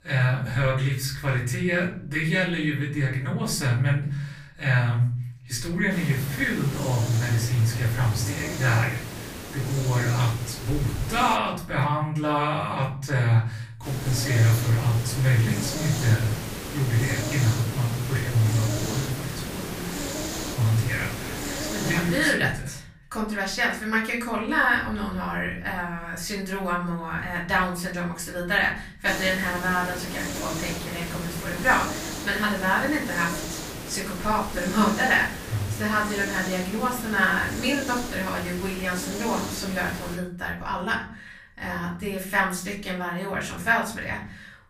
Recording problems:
off-mic speech; far
room echo; slight; dies away in 0.5 s
hiss; loud; from 6 to 11 s, from 14 to 22 s and from 29 to 40 s; 8 dB below the speech

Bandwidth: 15 kHz